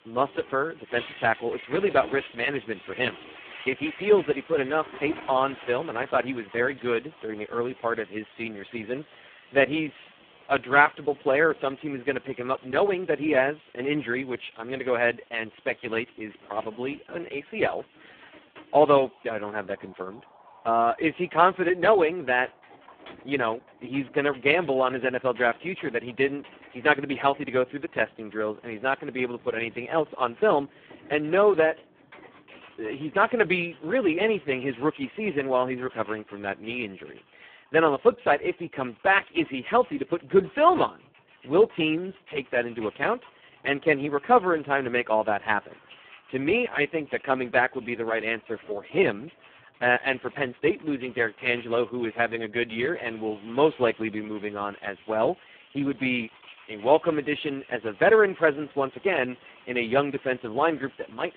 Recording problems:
phone-call audio; poor line
household noises; faint; throughout; 25 dB below the speech
traffic noise; faint; throughout; 30 dB below the speech

